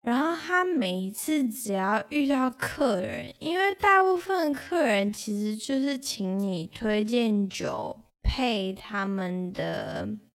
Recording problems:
wrong speed, natural pitch; too slow; 0.5 times normal speed

